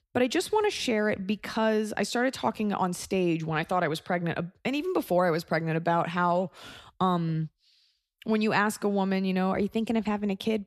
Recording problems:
none

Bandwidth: 13.5 kHz